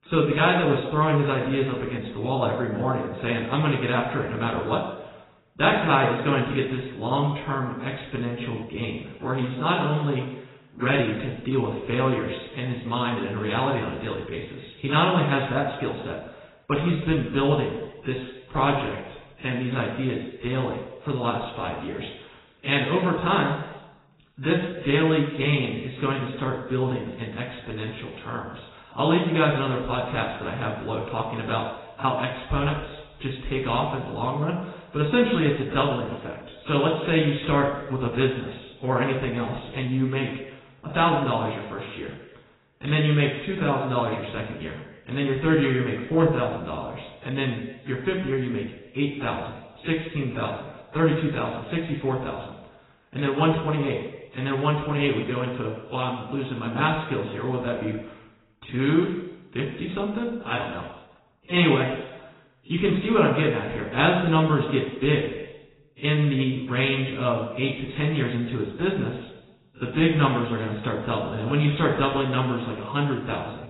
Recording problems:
off-mic speech; far
garbled, watery; badly; nothing above 4 kHz
room echo; noticeable; dies away in 1 s

